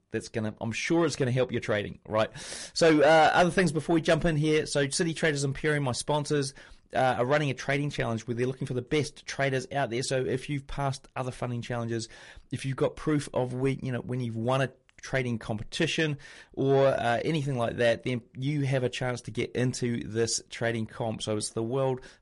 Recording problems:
distortion; slight; 10 dB below the speech
garbled, watery; slightly; nothing above 10.5 kHz

